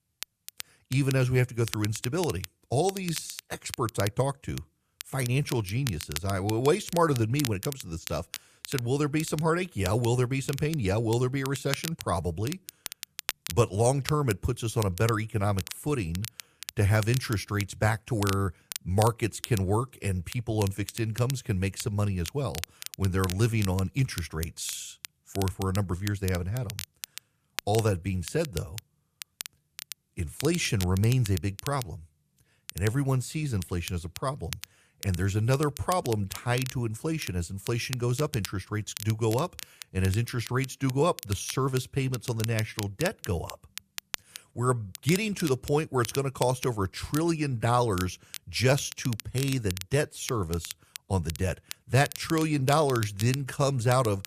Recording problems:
crackle, like an old record; noticeable; 10 dB below the speech

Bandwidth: 14.5 kHz